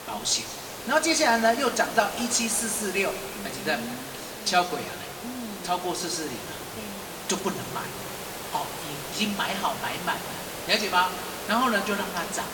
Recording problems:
room echo; slight; dies away in 1.9 s
off-mic speech; somewhat distant
hiss; loud; throughout; 9 dB below the speech

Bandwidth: 17.5 kHz